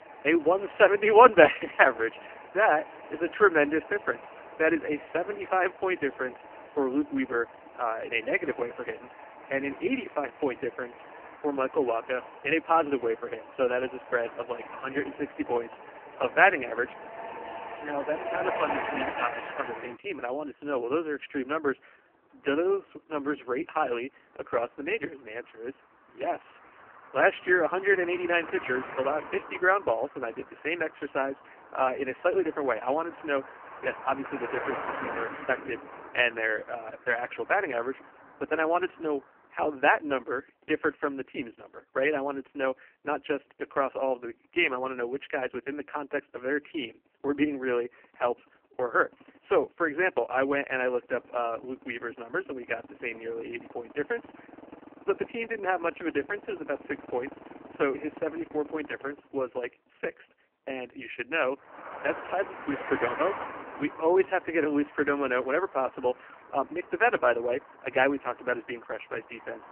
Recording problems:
phone-call audio; poor line; nothing above 3 kHz
traffic noise; noticeable; throughout; 15 dB below the speech

